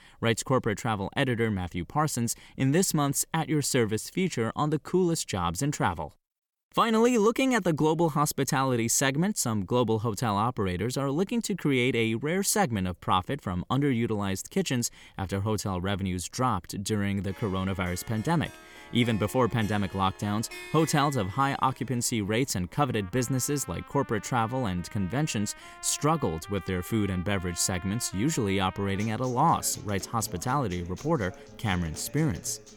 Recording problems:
background music; noticeable; from 17 s on; 20 dB below the speech

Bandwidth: 18 kHz